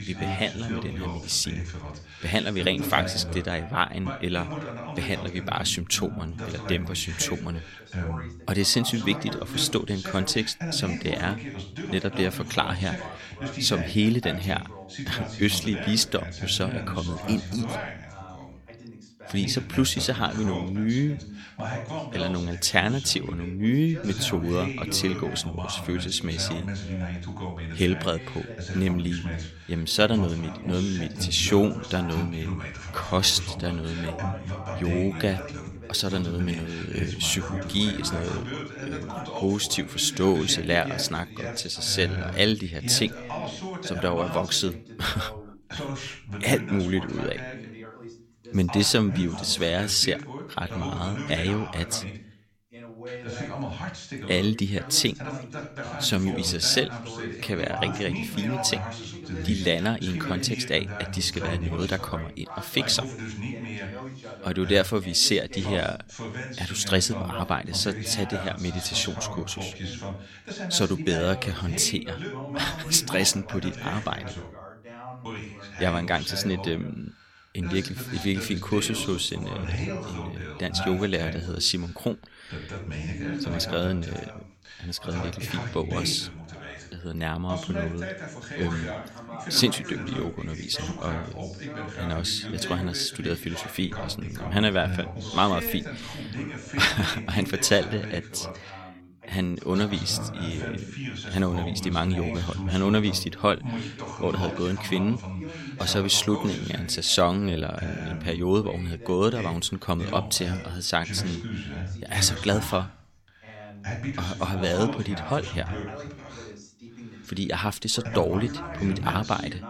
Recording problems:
background chatter; loud; throughout; 2 voices, 9 dB below the speech

